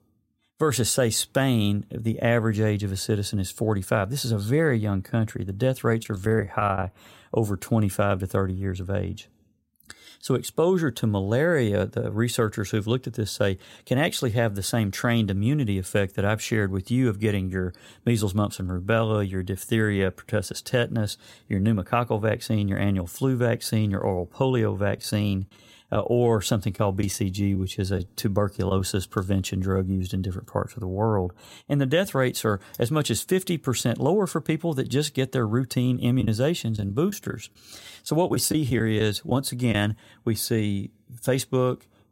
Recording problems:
choppy; very; at 6 s and from 36 to 40 s; 6% of the speech affected

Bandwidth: 16 kHz